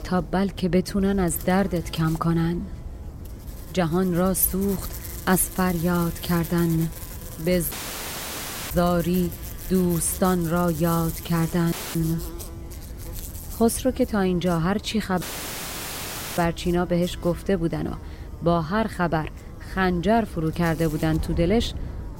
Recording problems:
electrical hum; noticeable; throughout; 60 Hz, 15 dB below the speech
wind noise on the microphone; occasional gusts; 20 dB below the speech
audio cutting out; filled with static; at 7.5 s for 1 s, at 12 s and at 15 s for 1 s

